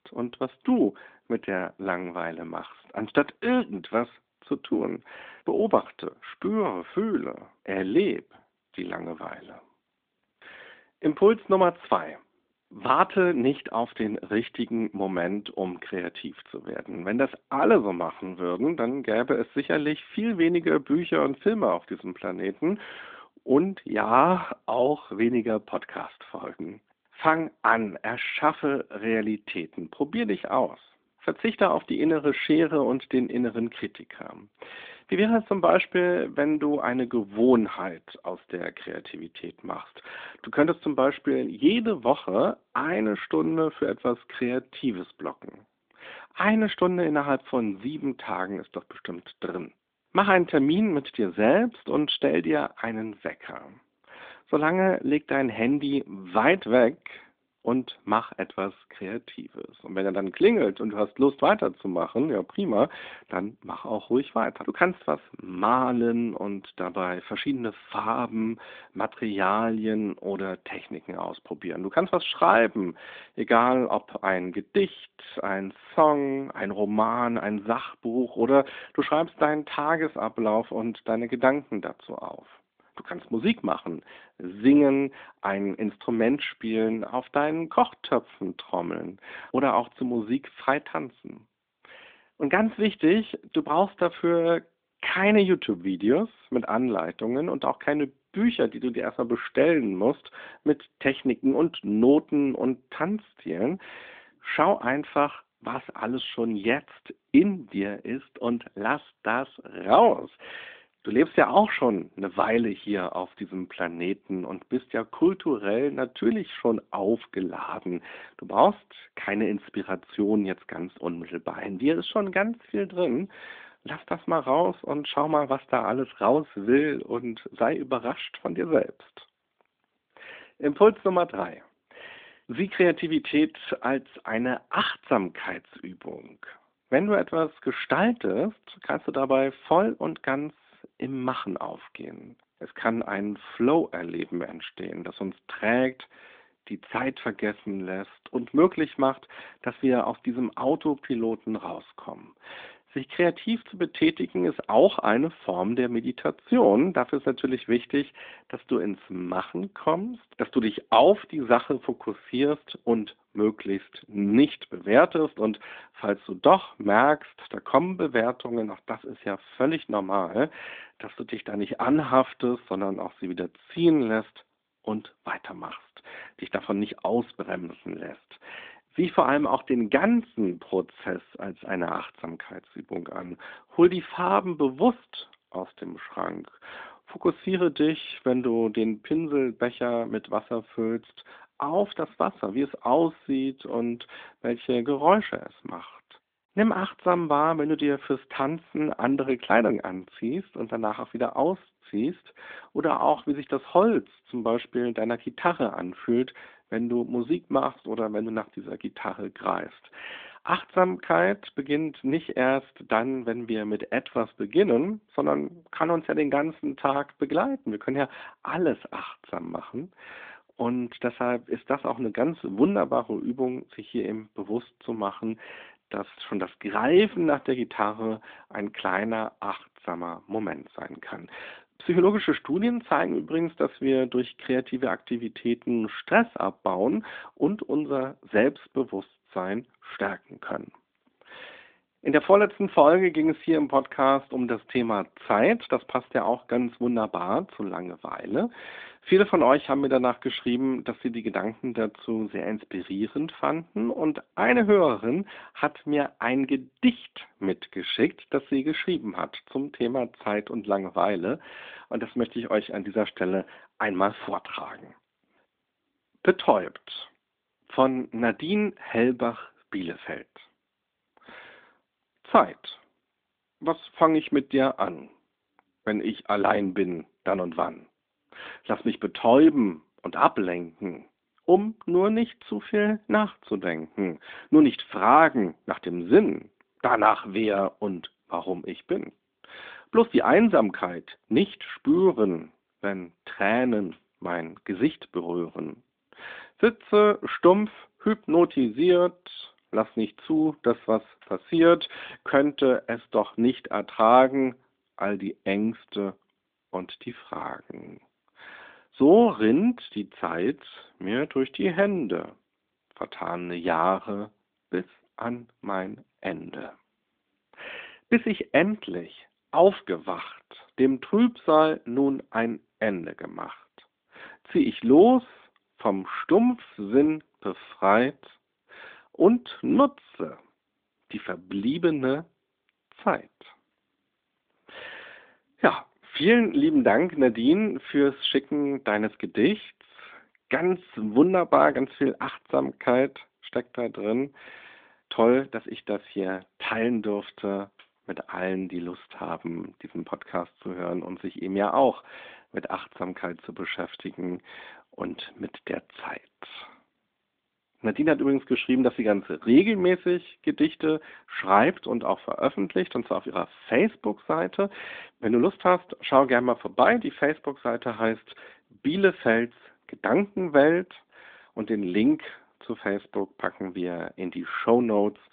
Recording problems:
phone-call audio

